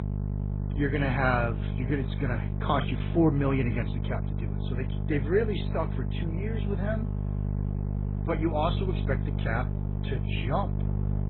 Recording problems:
garbled, watery; badly
high frequencies cut off; severe; nothing above 4 kHz
electrical hum; noticeable; throughout; 50 Hz, 10 dB below the speech

